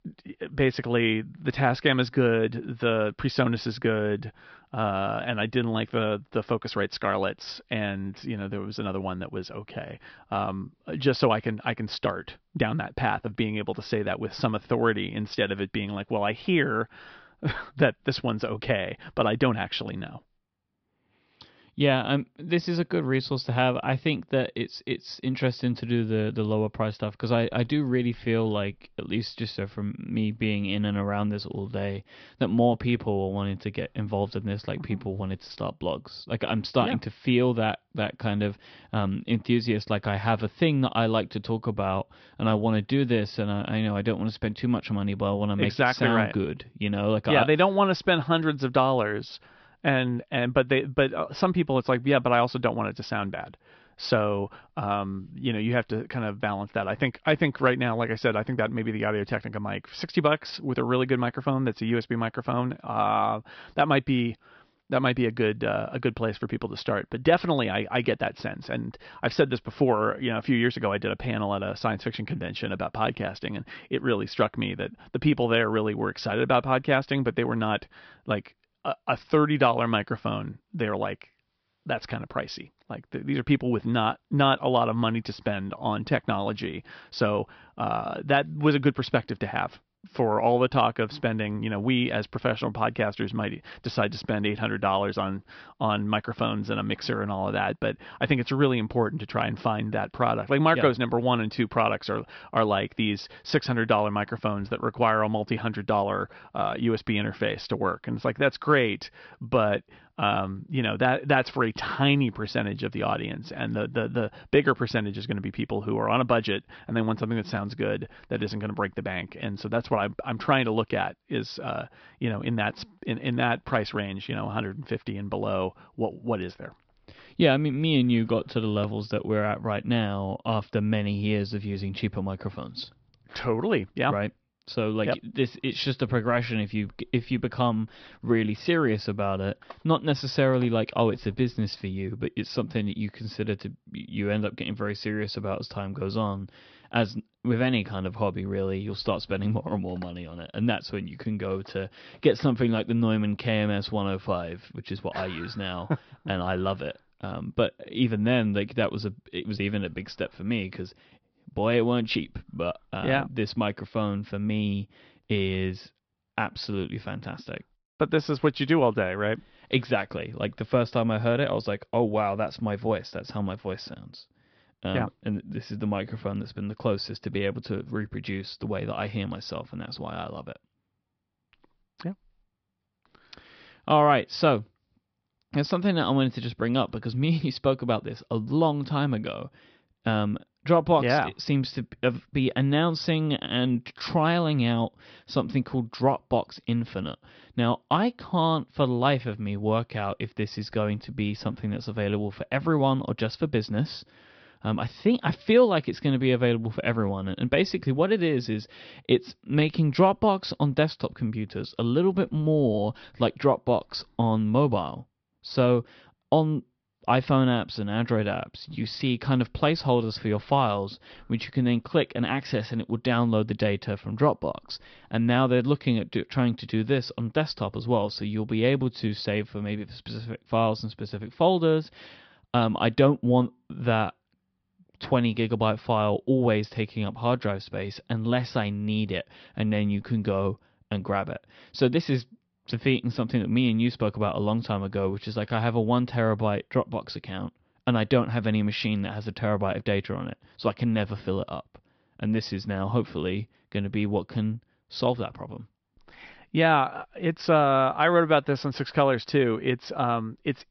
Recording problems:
high frequencies cut off; noticeable; nothing above 5.5 kHz

